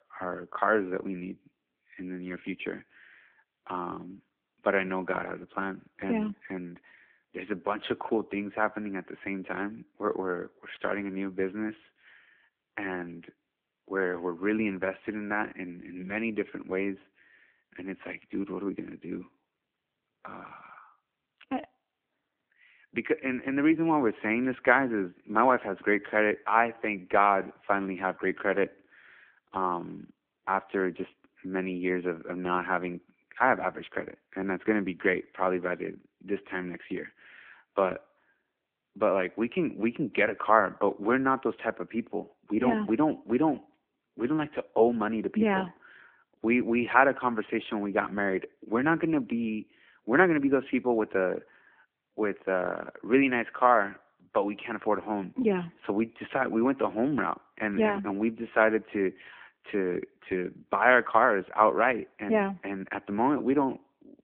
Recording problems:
phone-call audio

